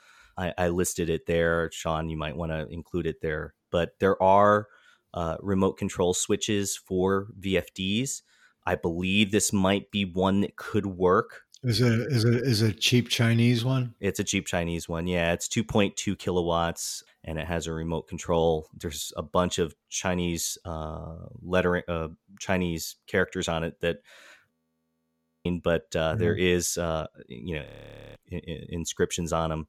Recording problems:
audio freezing; at 25 s for 1 s and at 28 s for 0.5 s

